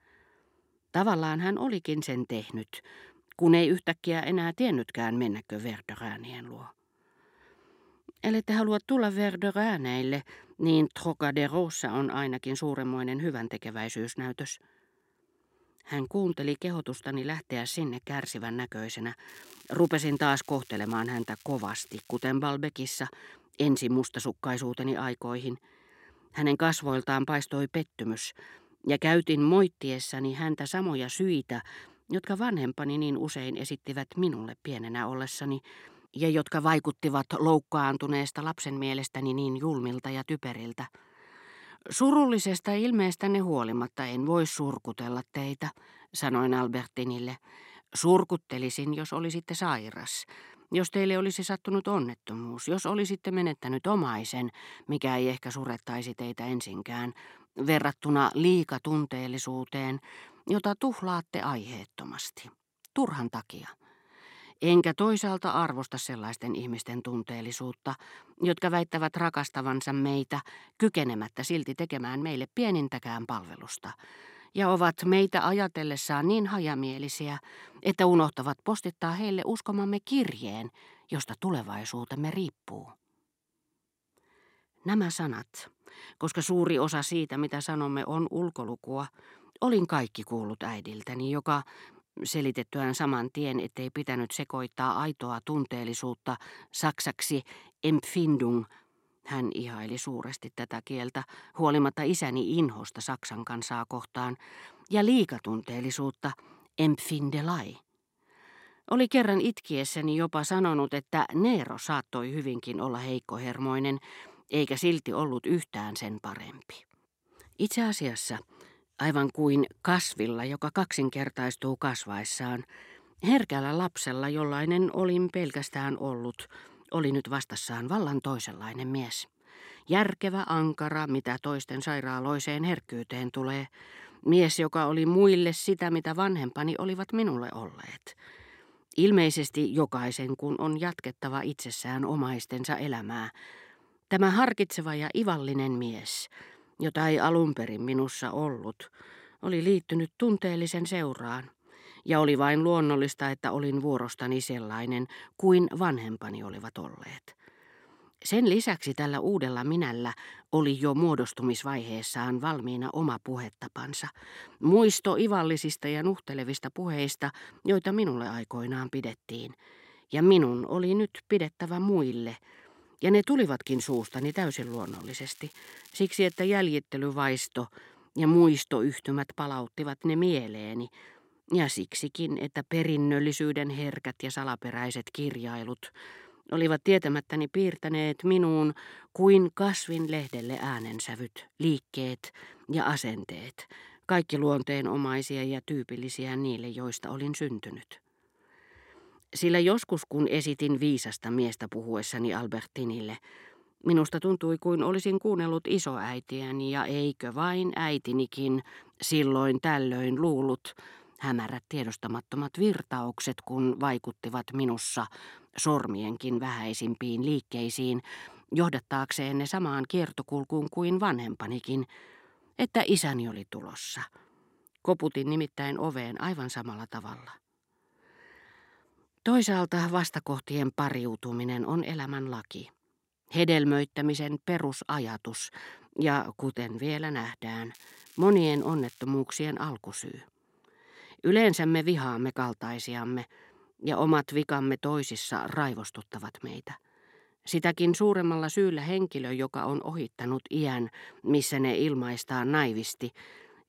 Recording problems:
crackling; faint; 4 times, first at 19 s; 25 dB below the speech

